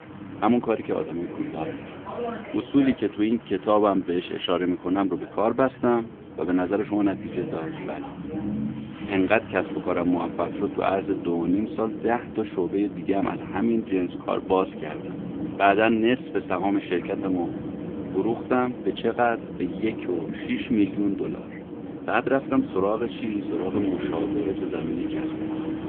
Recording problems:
phone-call audio; poor line; nothing above 3.5 kHz
traffic noise; loud; throughout; 9 dB below the speech

